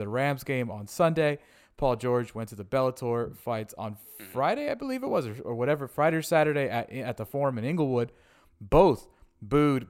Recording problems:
abrupt cut into speech; at the start

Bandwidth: 16 kHz